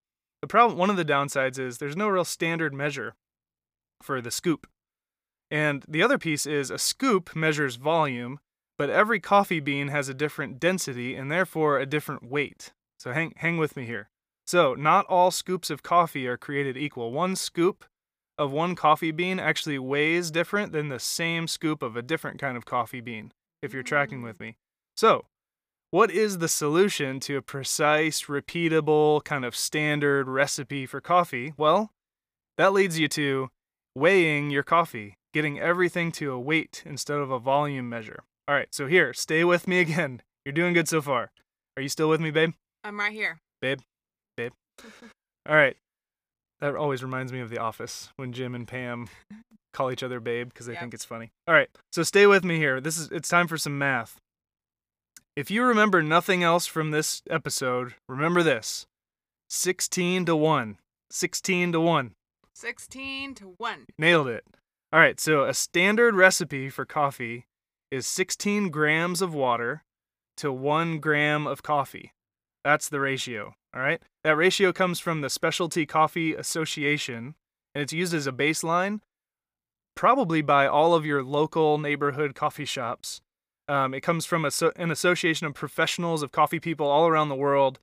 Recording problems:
none

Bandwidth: 15 kHz